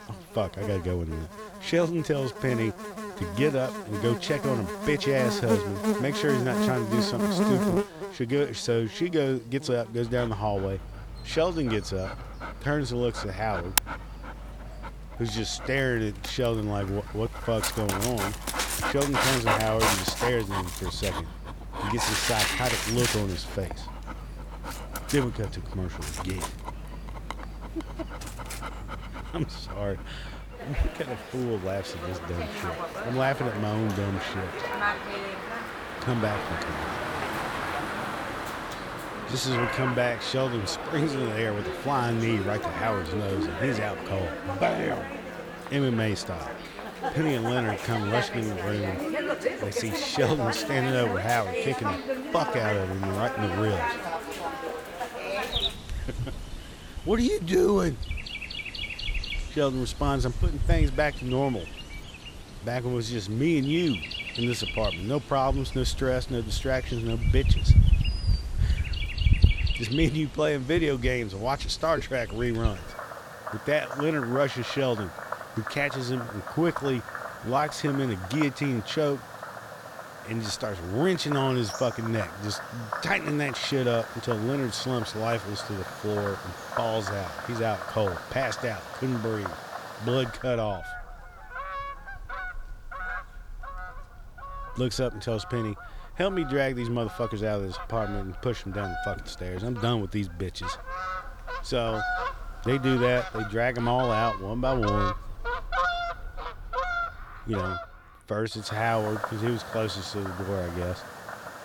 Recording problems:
animal sounds; loud; throughout; 4 dB below the speech

